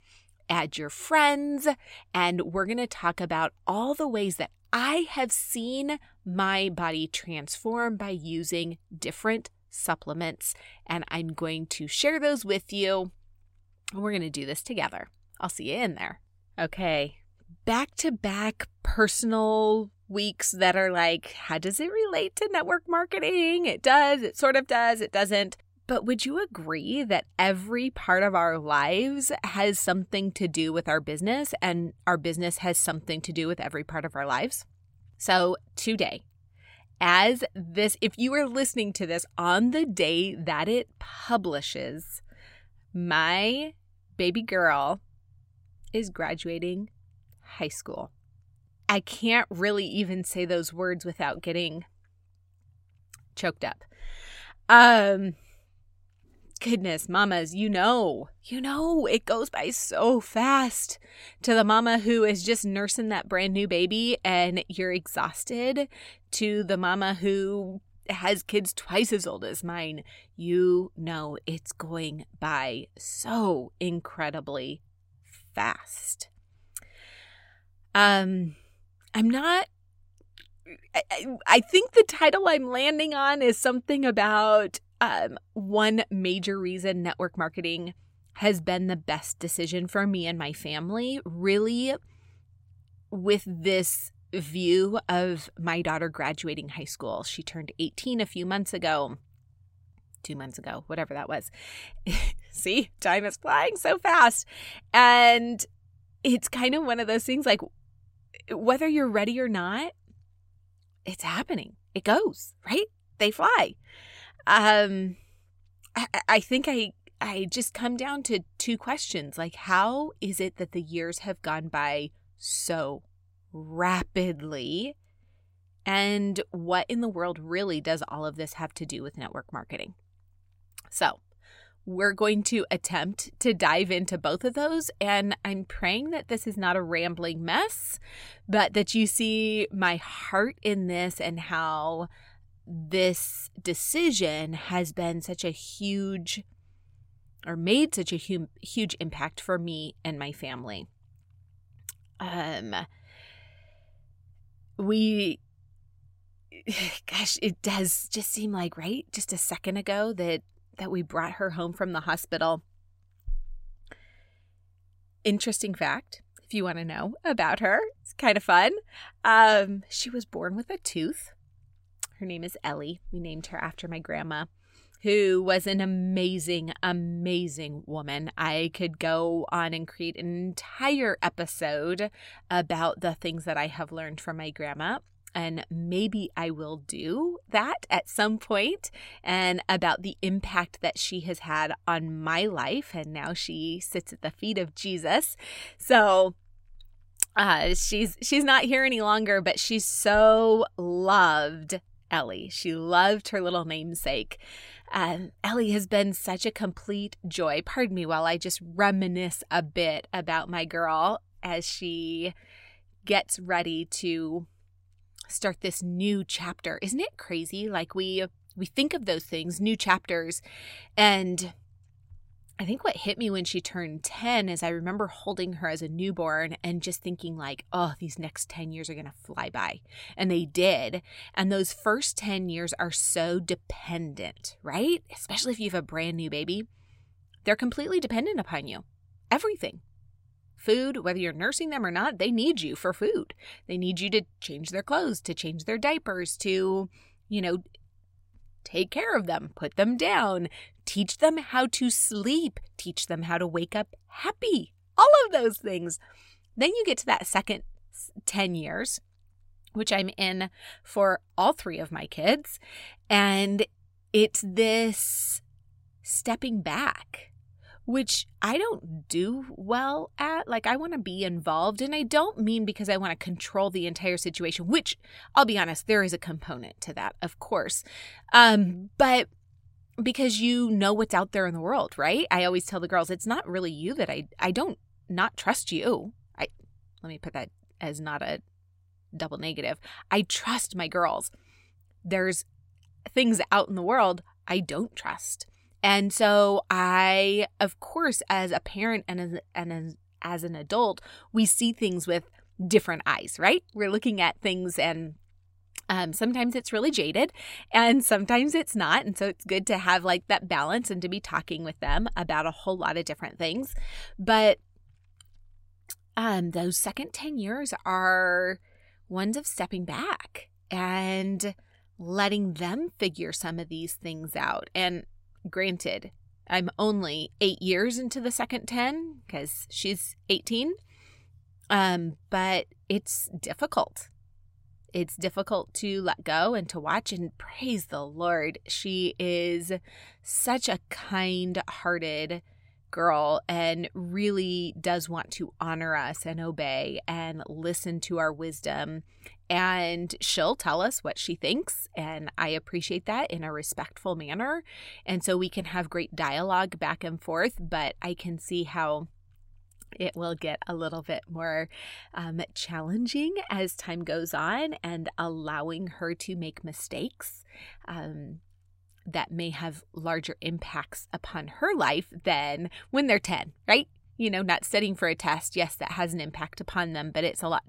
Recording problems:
none

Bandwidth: 16 kHz